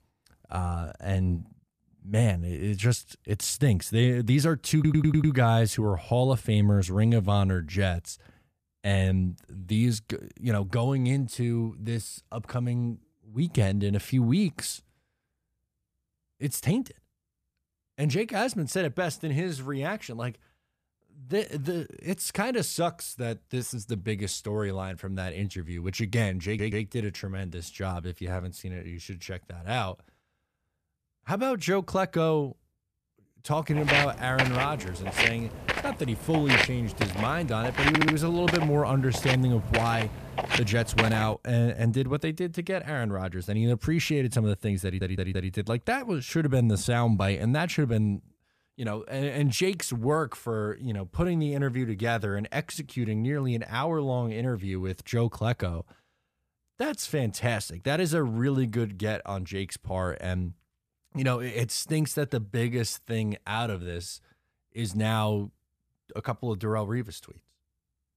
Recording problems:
audio stuttering; 4 times, first at 5 s
footsteps; loud; from 34 to 41 s; peak 6 dB above the speech

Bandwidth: 14.5 kHz